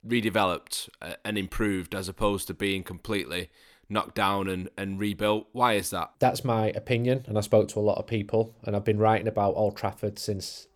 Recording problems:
none

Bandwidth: 18.5 kHz